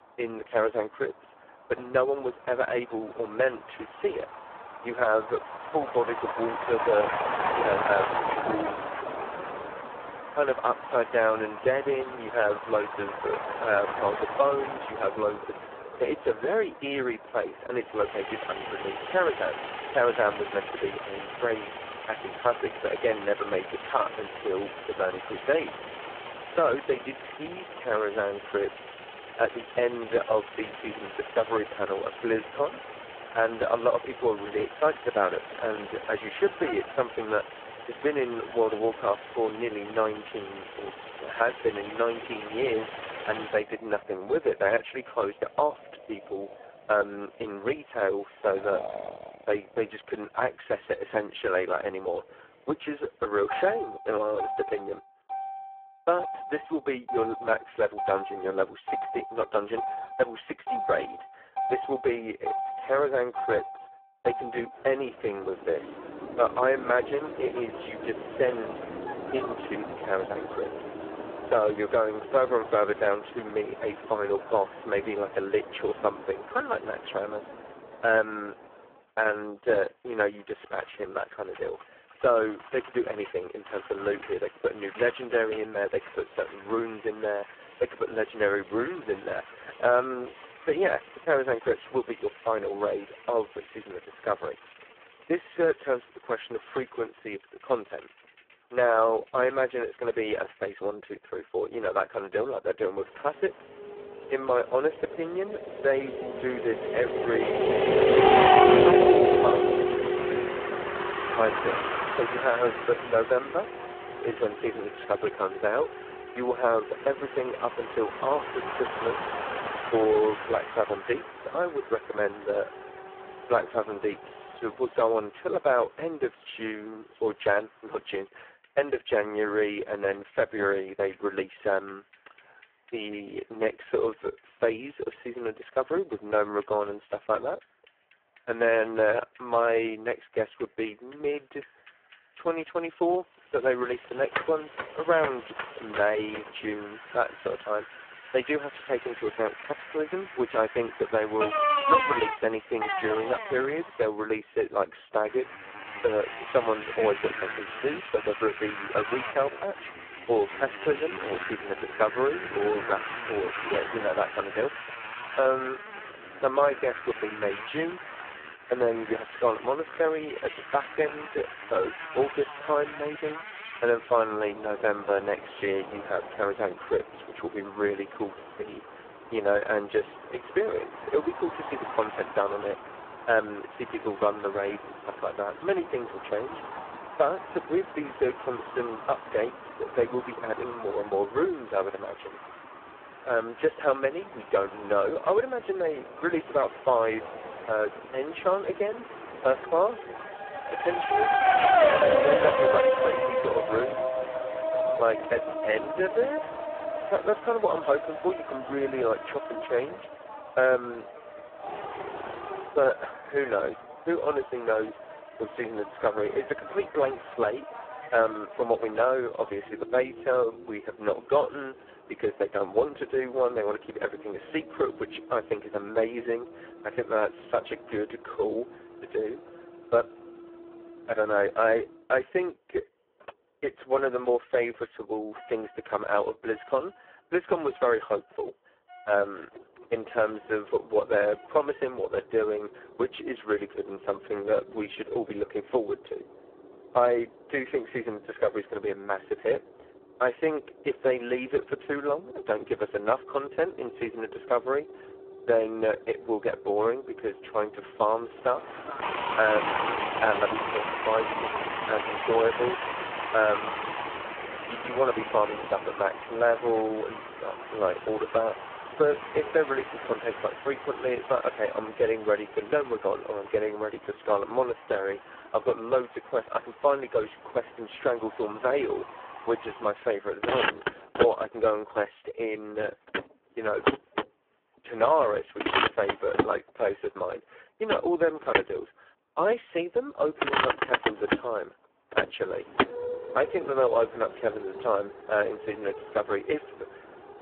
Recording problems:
phone-call audio; poor line
traffic noise; loud; throughout; 3 dB below the speech

